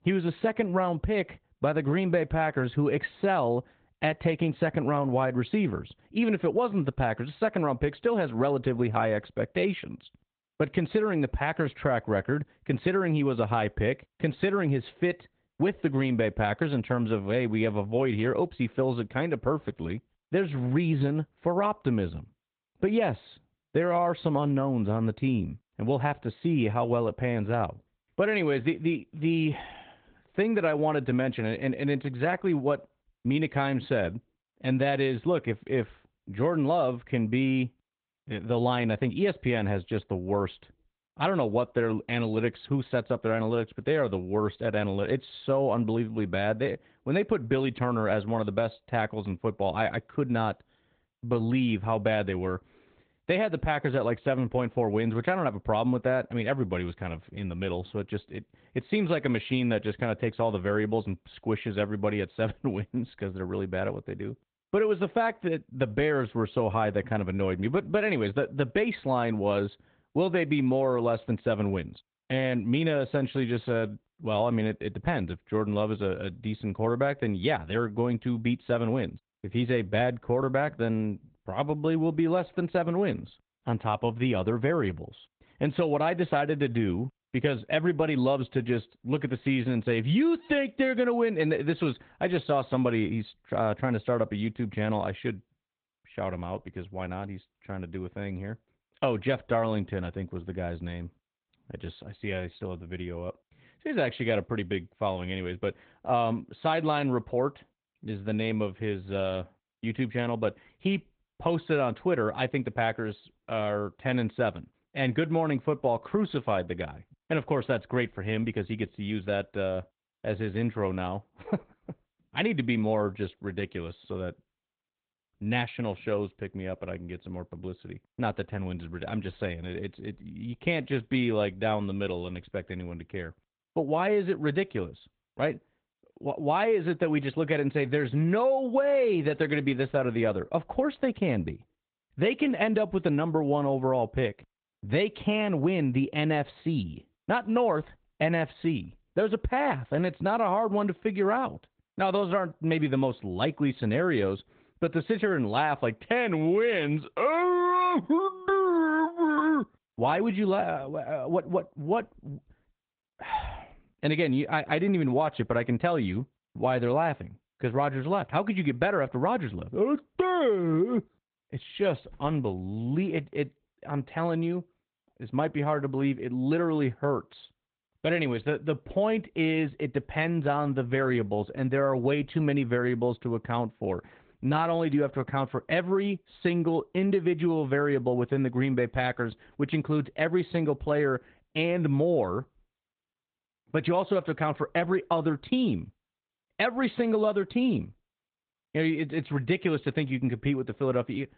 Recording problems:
high frequencies cut off; severe; nothing above 4 kHz
garbled, watery; slightly

